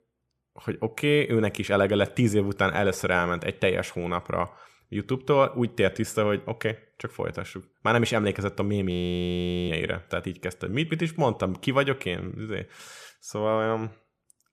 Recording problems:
audio freezing; at 9 s for 1 s

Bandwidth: 14.5 kHz